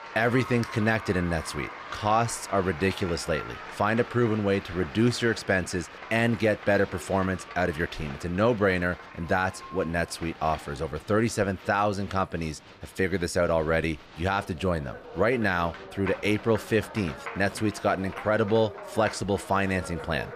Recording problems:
crowd noise; noticeable; throughout; 15 dB below the speech

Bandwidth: 14.5 kHz